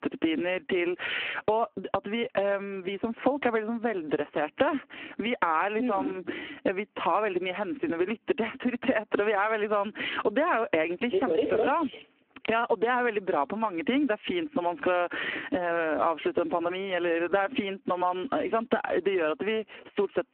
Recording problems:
phone-call audio; poor line
squashed, flat; heavily

